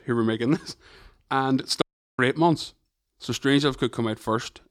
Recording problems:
audio cutting out; at 2 s

